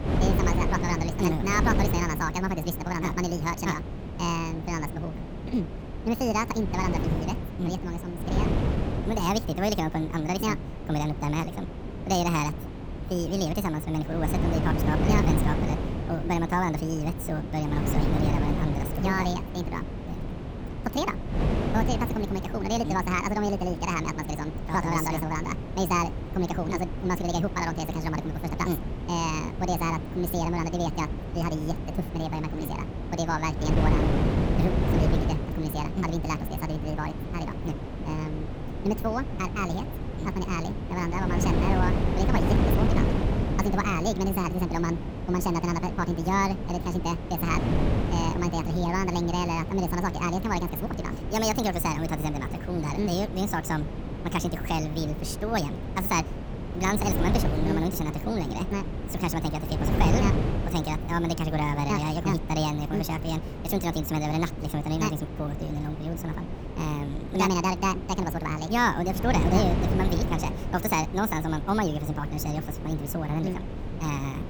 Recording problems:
wrong speed and pitch; too fast and too high; 1.7 times normal speed
wind noise on the microphone; heavy; 7 dB below the speech

